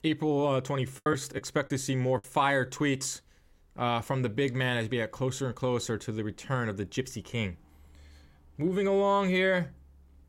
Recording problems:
choppy; very; from 1 to 2 s; 11% of the speech affected

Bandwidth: 16 kHz